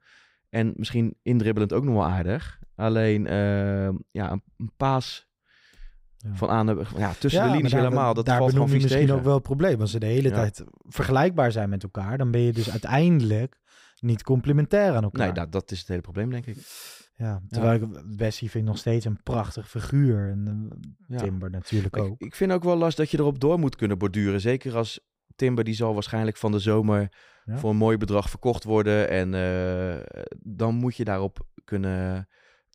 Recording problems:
none

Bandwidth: 15.5 kHz